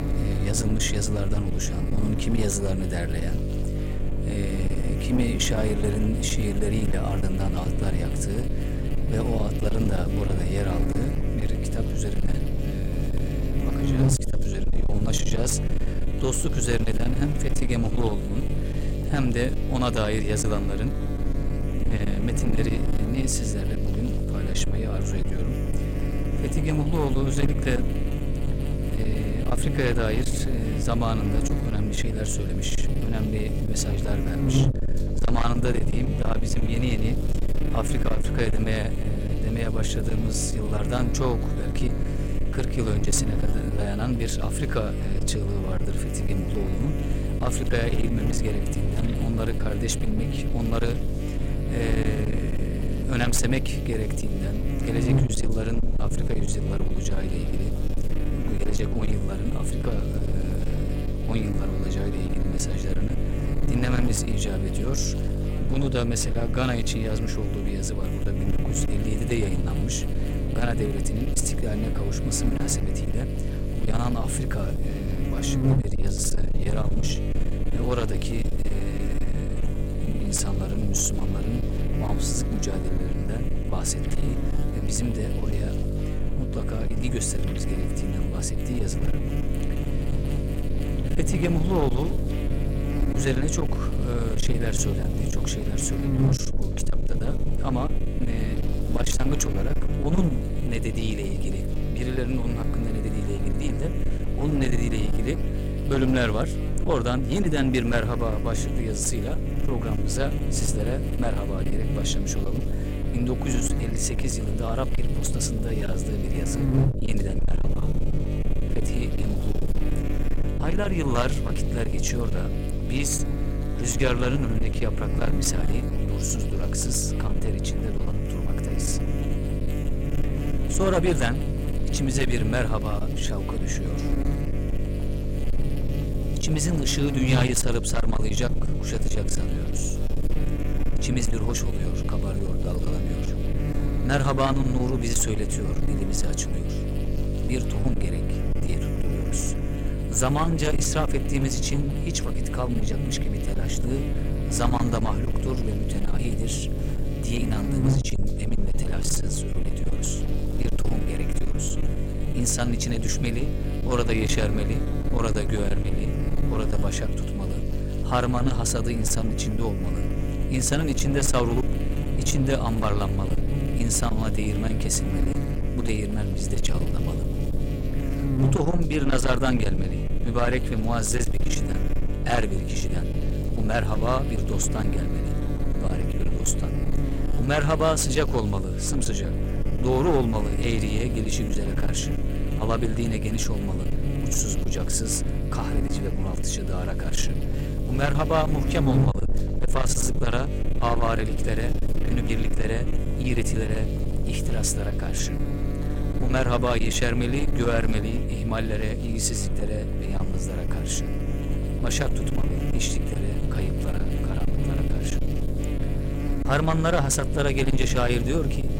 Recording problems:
distortion; slight; 13% of the sound clipped
electrical hum; loud; throughout; 50 Hz, 5 dB below the speech

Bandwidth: 16 kHz